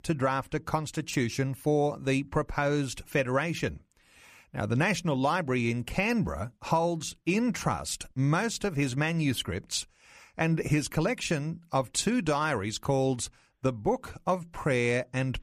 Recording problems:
none

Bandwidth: 14.5 kHz